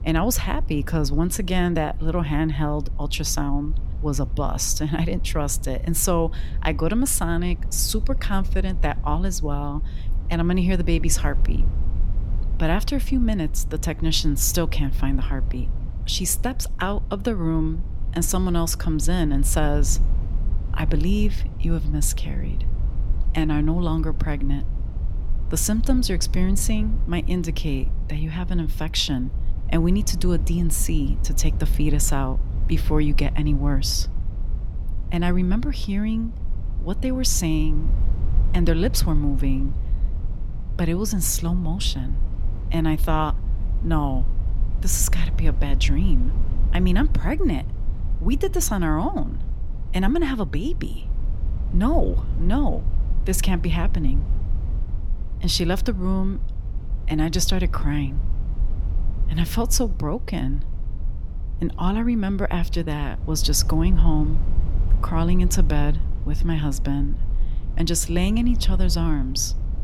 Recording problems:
low rumble; noticeable; throughout; 15 dB below the speech

